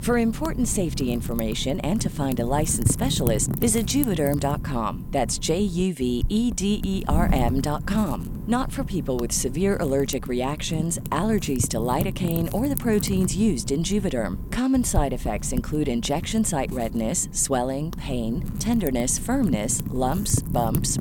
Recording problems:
wind noise on the microphone; occasional gusts; 15 dB below the speech

